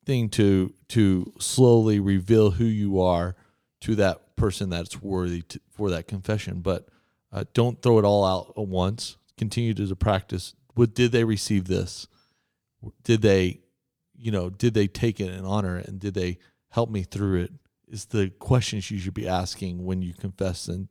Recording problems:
none

